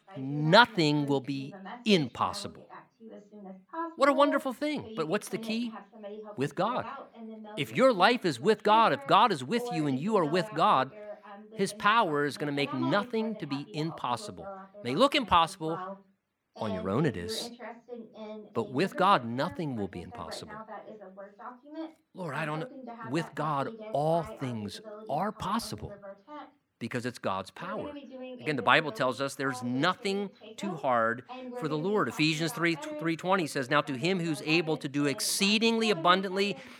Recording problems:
voice in the background; noticeable; throughout; 15 dB below the speech

